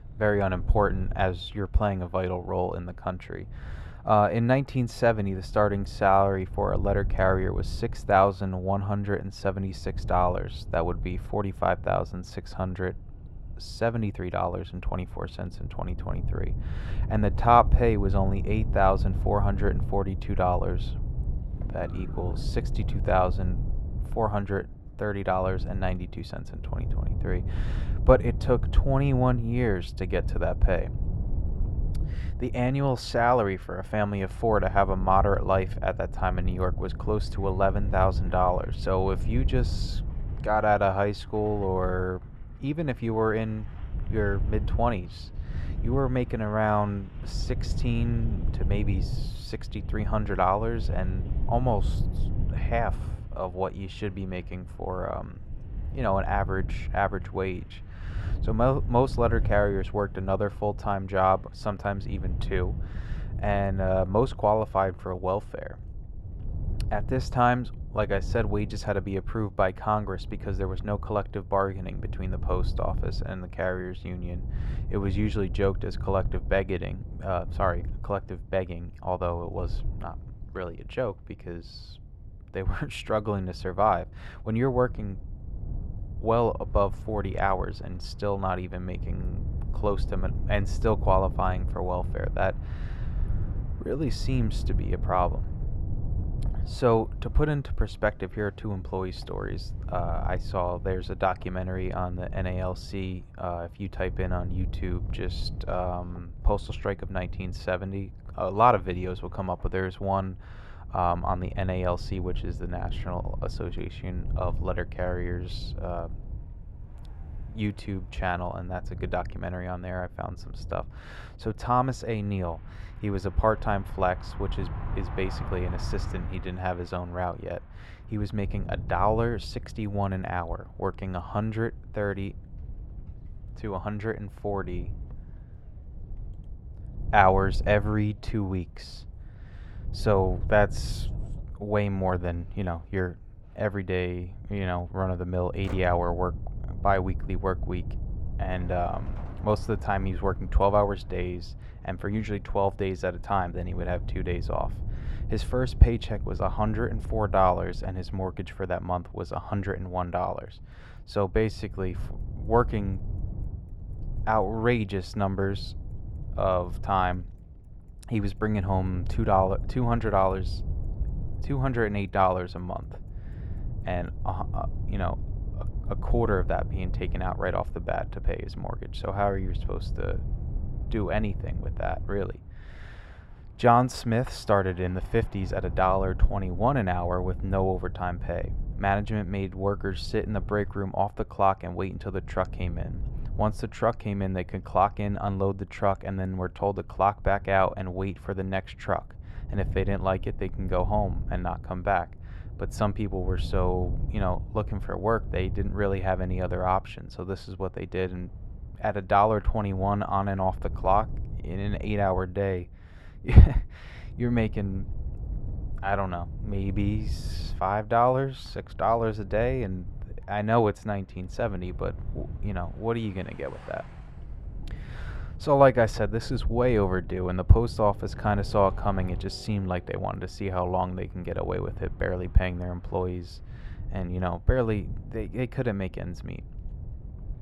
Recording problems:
muffled; very; fading above 3.5 kHz
wind noise on the microphone; occasional gusts; 20 dB below the speech
traffic noise; faint; throughout; 25 dB below the speech

